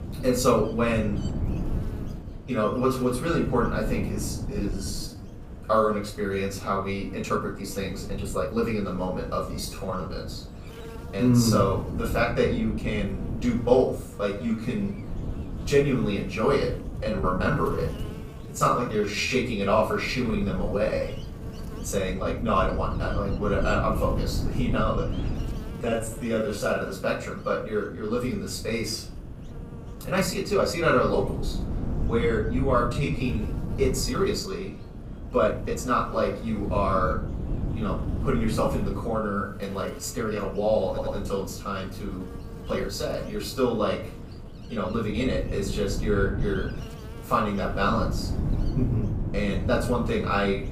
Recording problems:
off-mic speech; far
room echo; slight; dies away in 0.5 s
wind noise on the microphone; occasional gusts; 15 dB below the speech
electrical hum; faint; throughout; 60 Hz, 20 dB below the speech
uneven, jittery; strongly; from 4.5 to 45 s
audio stuttering; at 41 s

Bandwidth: 15 kHz